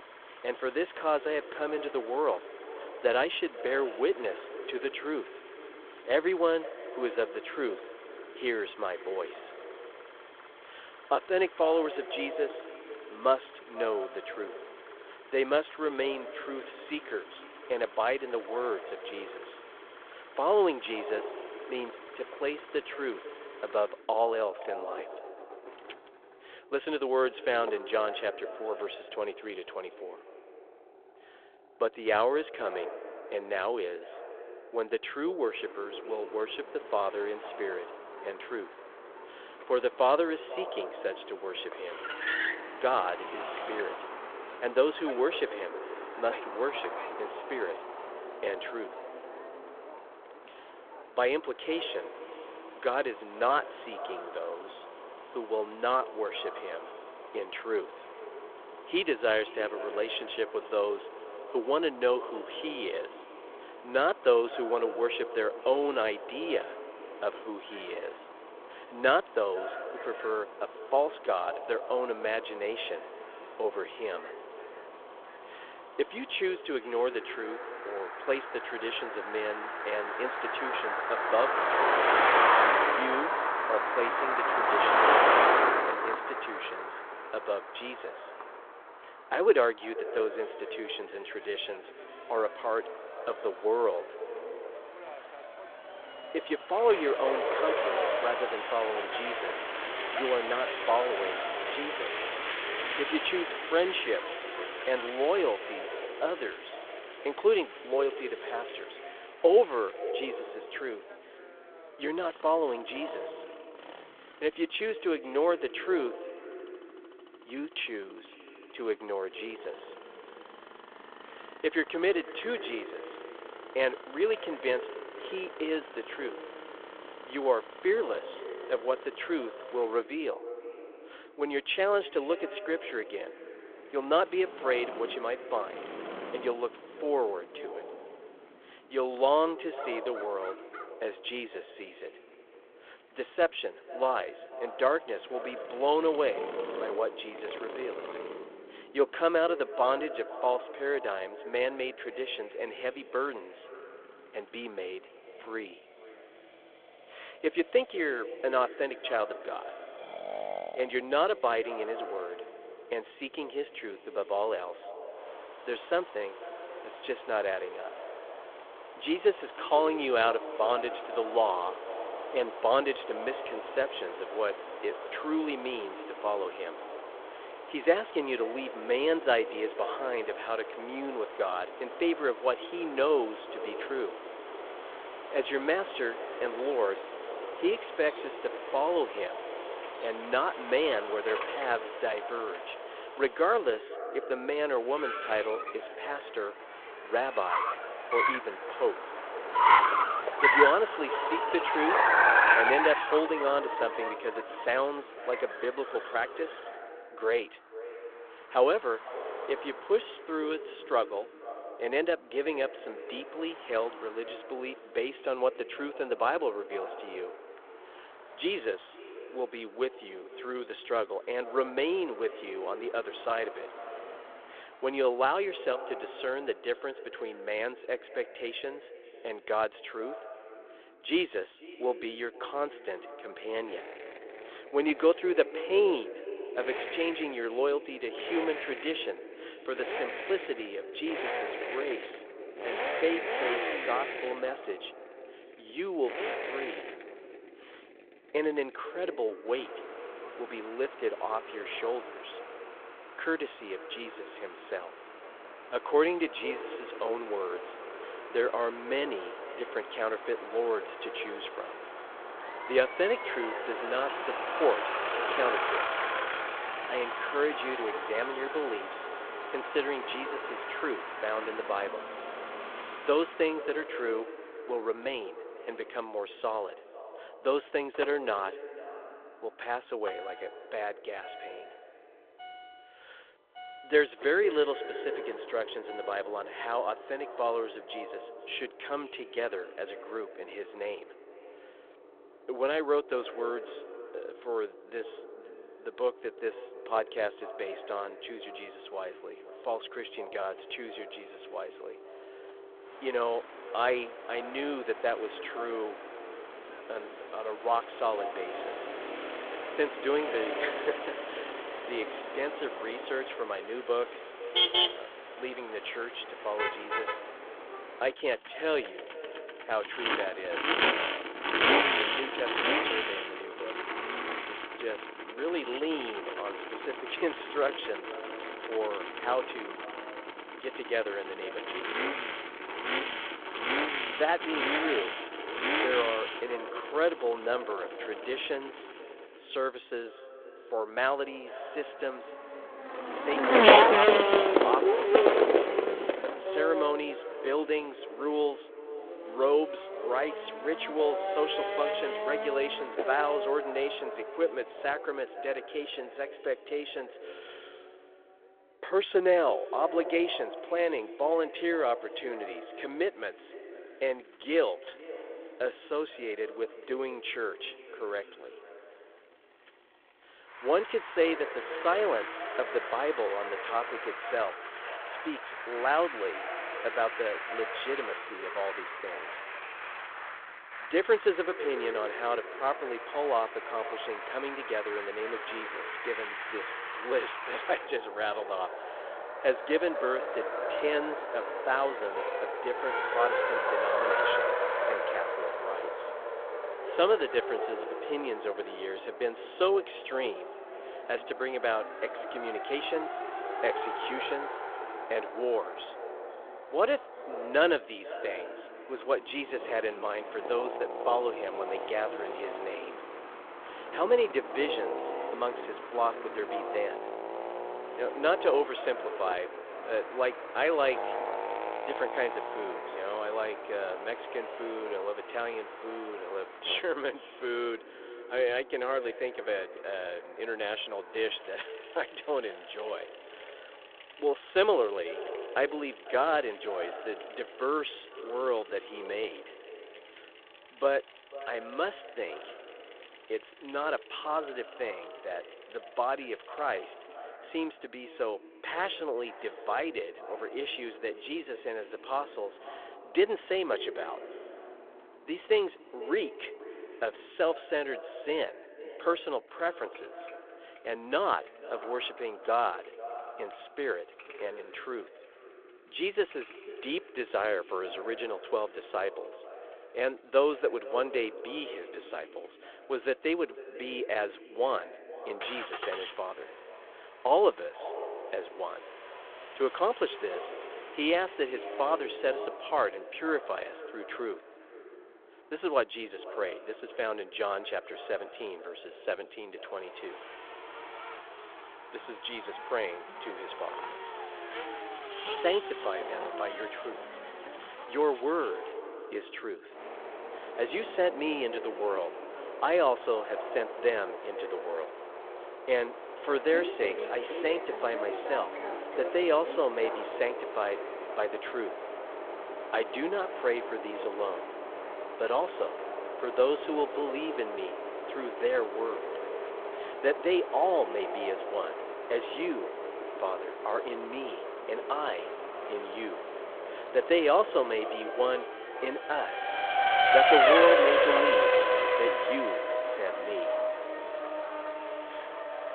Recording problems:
echo of what is said; noticeable; throughout; 490 ms later, 15 dB below the speech
phone-call audio
traffic noise; loud; throughout; 1 dB below the speech

